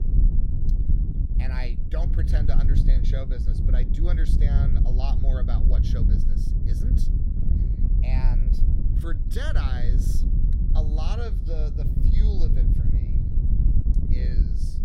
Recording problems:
wind noise on the microphone; heavy; 1 dB below the speech

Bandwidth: 16.5 kHz